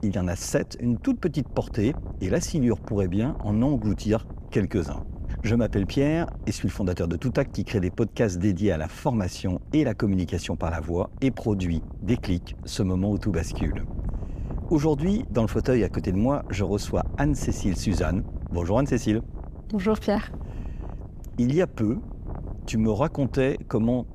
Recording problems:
wind noise on the microphone; occasional gusts; 20 dB below the speech

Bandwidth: 15 kHz